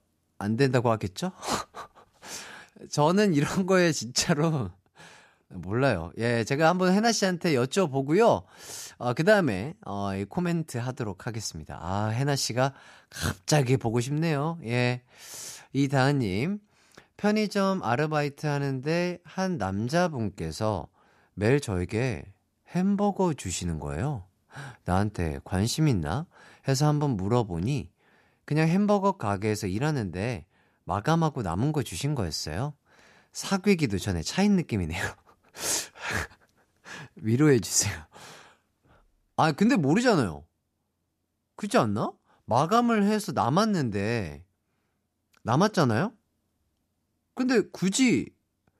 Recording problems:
none

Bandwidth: 14.5 kHz